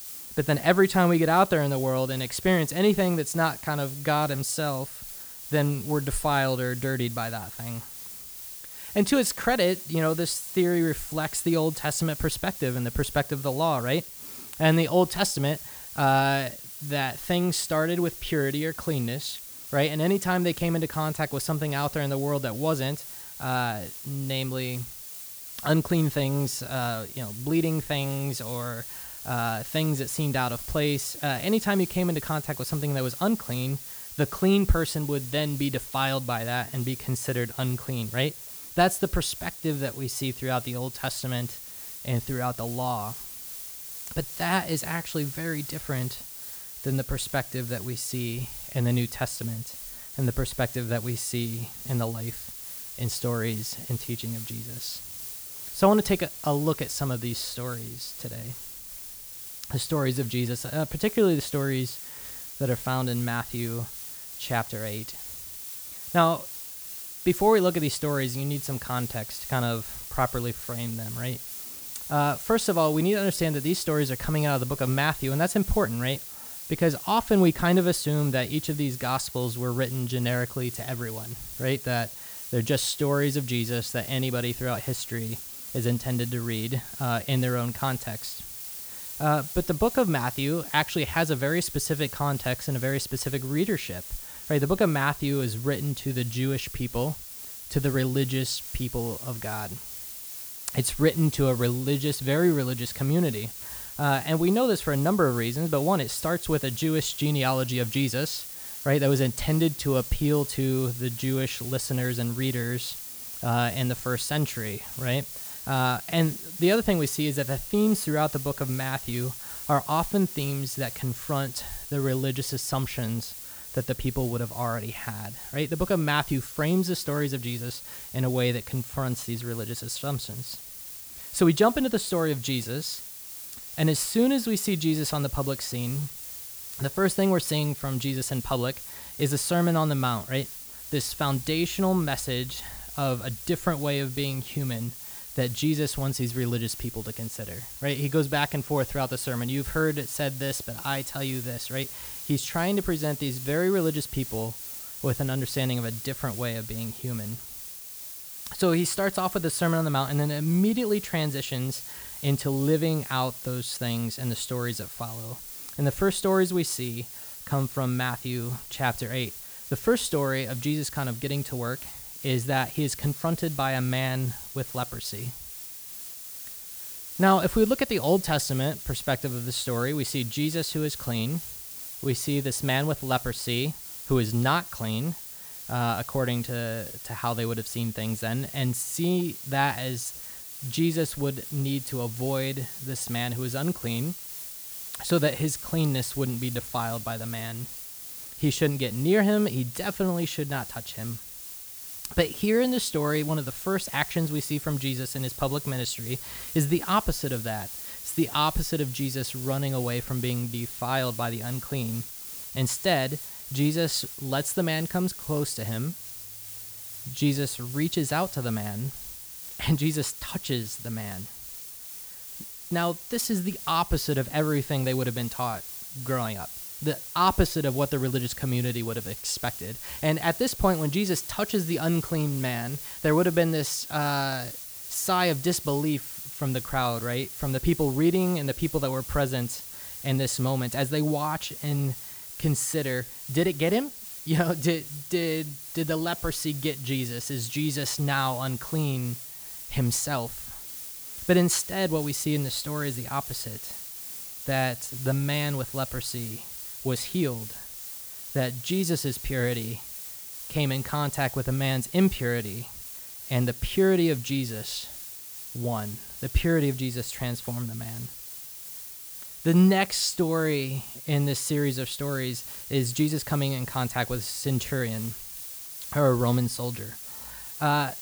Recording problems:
hiss; loud; throughout; 9 dB below the speech

